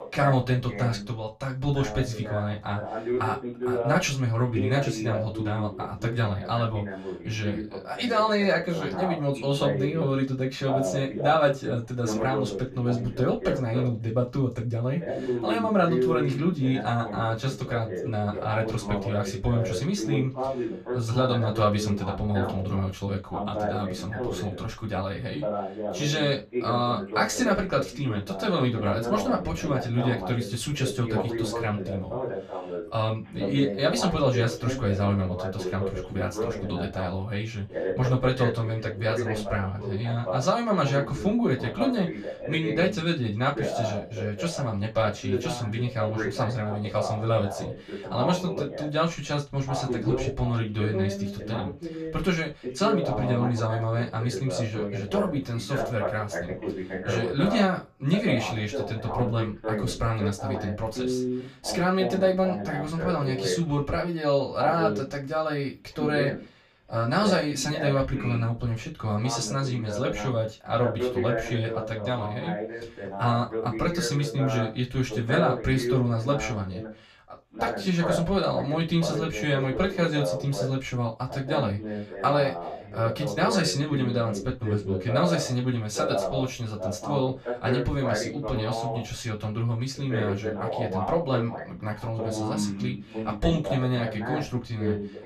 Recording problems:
off-mic speech; far
room echo; very slight; dies away in 0.2 s
voice in the background; loud; throughout; 5 dB below the speech

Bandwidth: 14.5 kHz